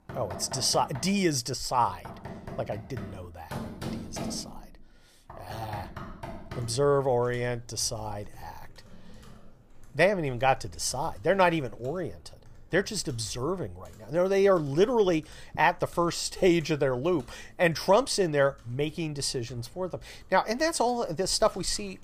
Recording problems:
household noises; noticeable; throughout; 20 dB below the speech

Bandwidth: 15 kHz